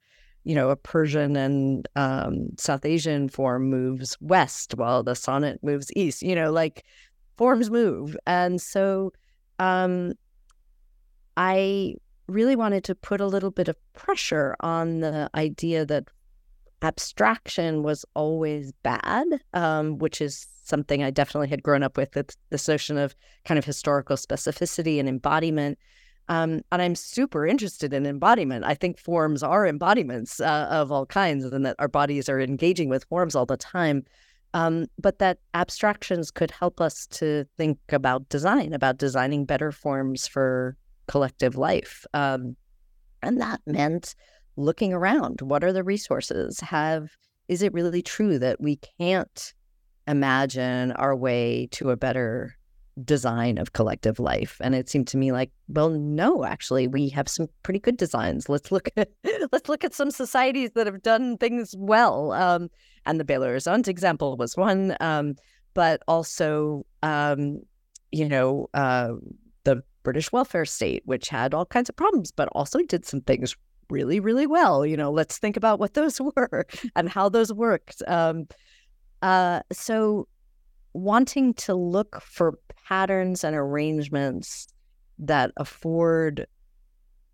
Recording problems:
none

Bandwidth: 17.5 kHz